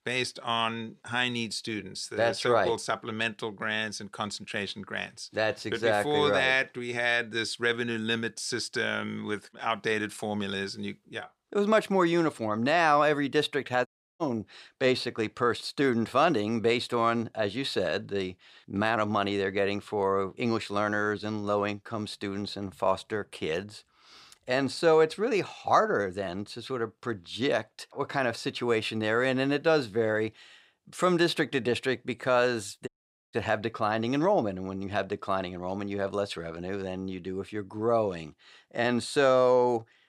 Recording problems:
audio cutting out; at 14 s and at 33 s

